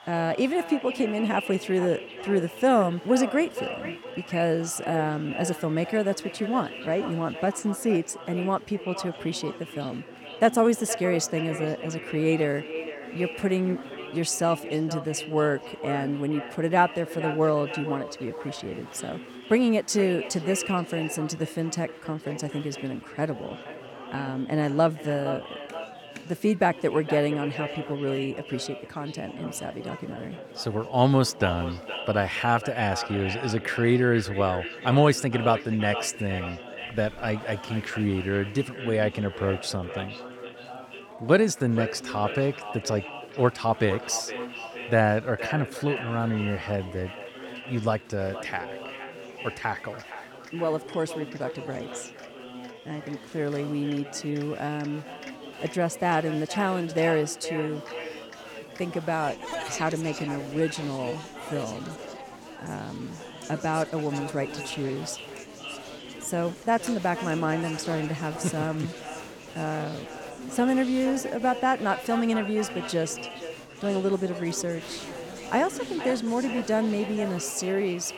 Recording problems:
echo of what is said; strong; throughout; 470 ms later, 10 dB below the speech
chatter from many people; noticeable; throughout; 15 dB below the speech

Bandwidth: 17.5 kHz